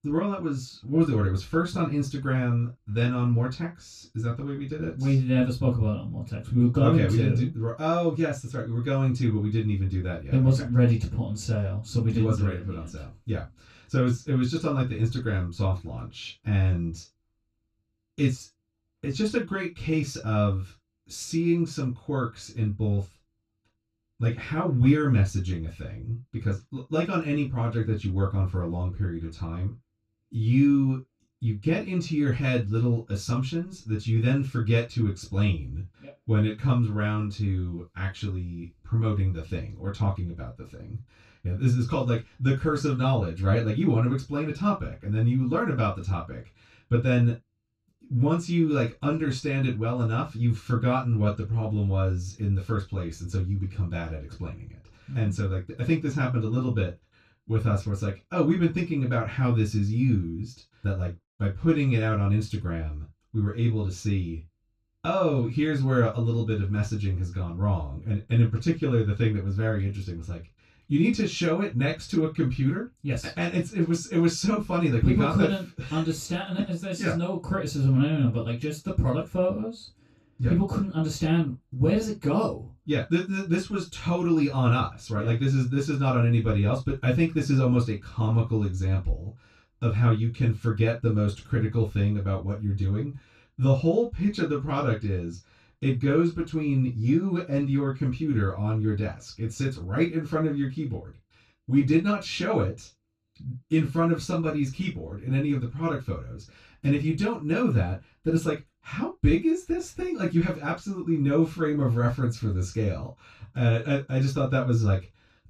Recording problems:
off-mic speech; far
room echo; slight; dies away in 0.2 s

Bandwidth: 14.5 kHz